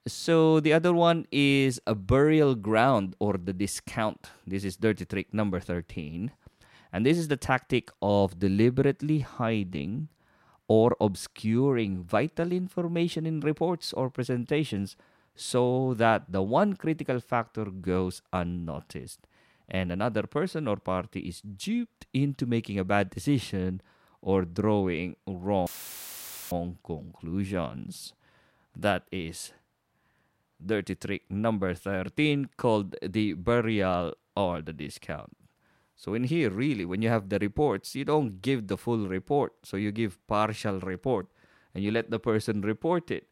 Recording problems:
audio cutting out; filled with static; at 26 s for 1 s

